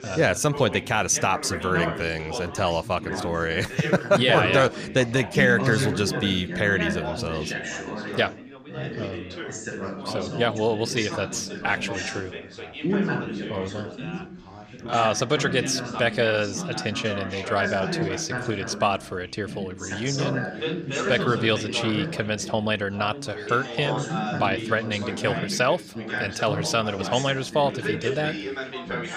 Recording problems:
background chatter; loud; throughout; 4 voices, 6 dB below the speech

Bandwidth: 15 kHz